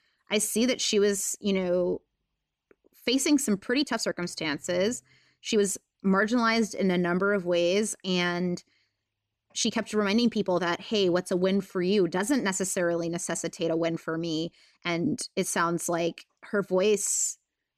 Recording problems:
uneven, jittery; strongly; from 0.5 to 17 s

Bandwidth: 14 kHz